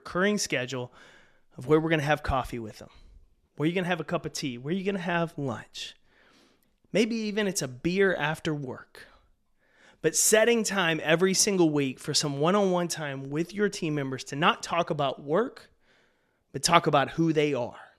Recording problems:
none

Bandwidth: 14 kHz